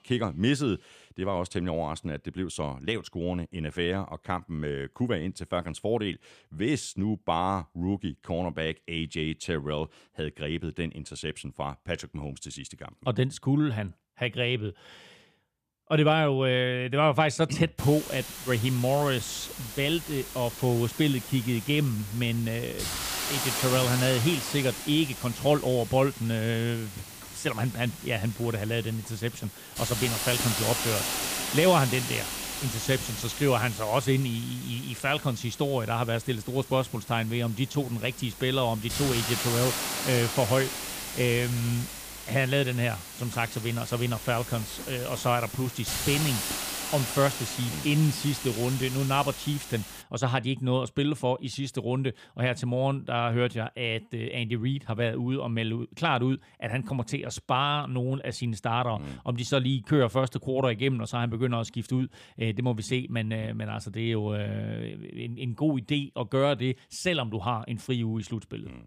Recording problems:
hiss; loud; from 18 to 50 s; 5 dB below the speech

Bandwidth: 15 kHz